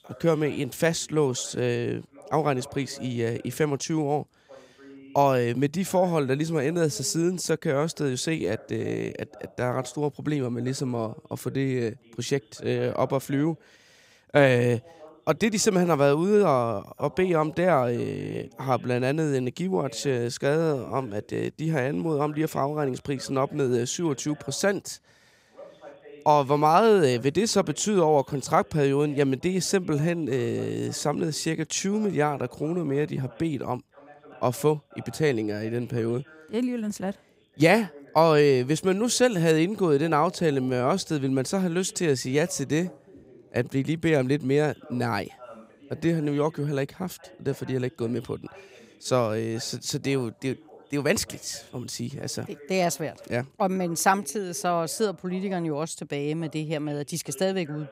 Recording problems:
voice in the background; faint; throughout; 25 dB below the speech

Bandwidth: 15.5 kHz